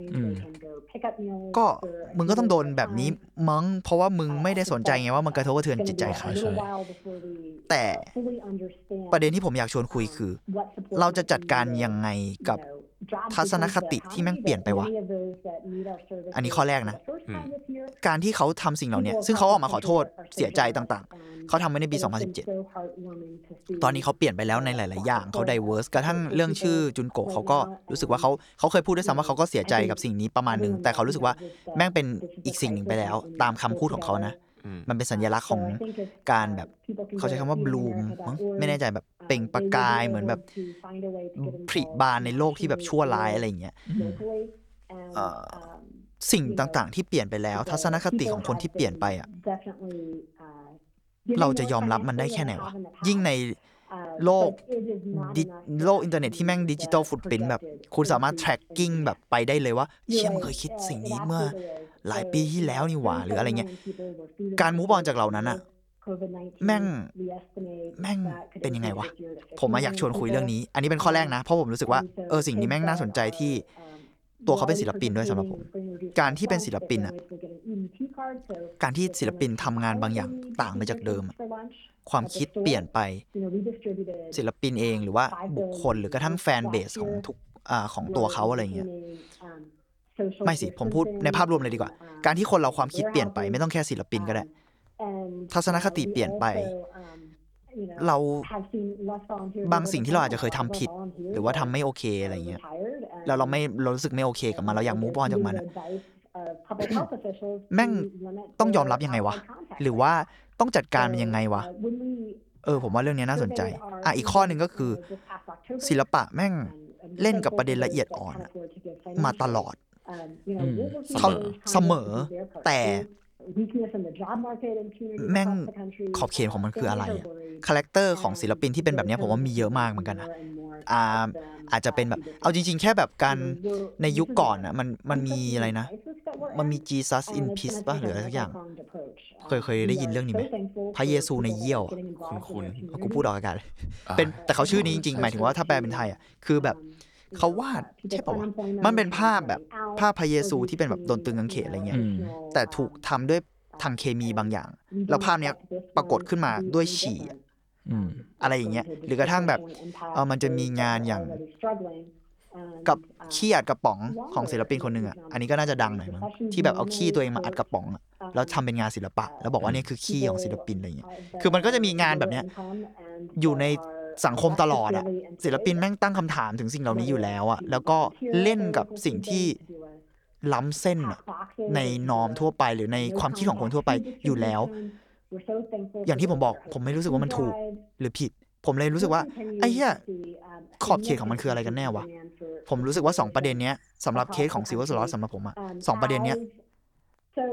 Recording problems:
voice in the background; loud; throughout; 9 dB below the speech

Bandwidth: 18.5 kHz